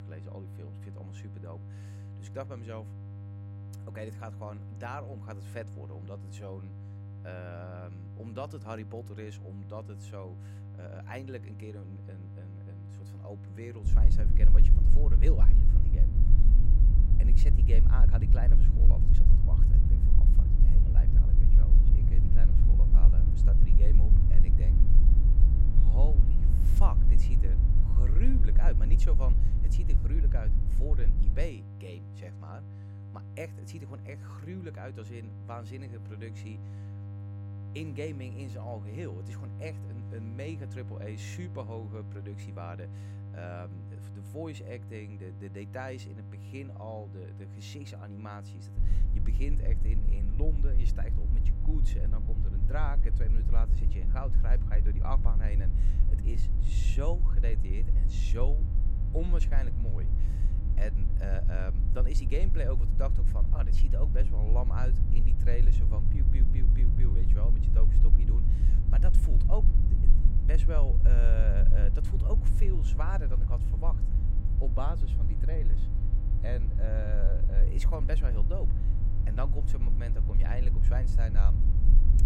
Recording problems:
electrical hum; loud; throughout; 50 Hz, 9 dB below the speech
low rumble; loud; from 14 to 31 s and from 49 s on; 4 dB below the speech

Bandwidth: 16 kHz